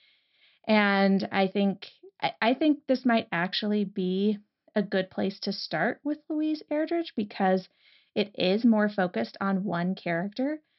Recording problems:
high frequencies cut off; noticeable; nothing above 5.5 kHz

